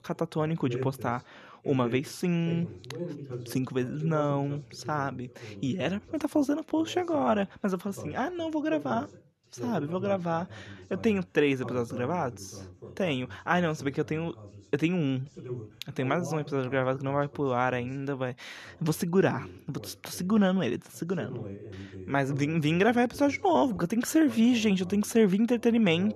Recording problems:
voice in the background; noticeable; throughout; 15 dB below the speech

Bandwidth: 13.5 kHz